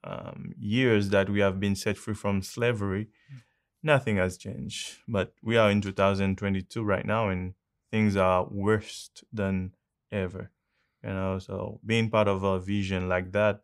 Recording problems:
none

